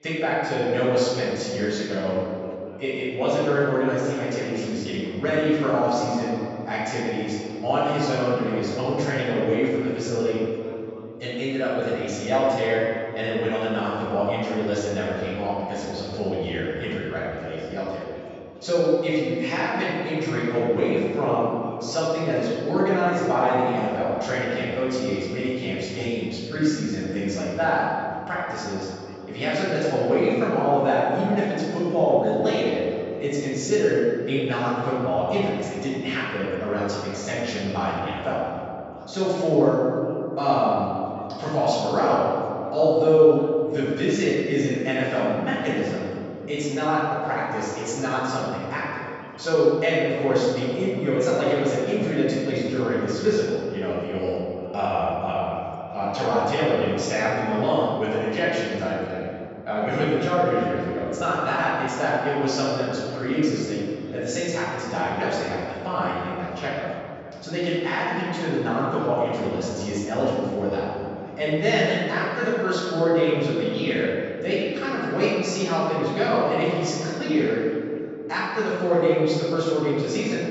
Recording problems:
room echo; strong; dies away in 2.7 s
off-mic speech; far
high frequencies cut off; noticeable; nothing above 8 kHz
background chatter; faint; throughout; 4 voices, 25 dB below the speech

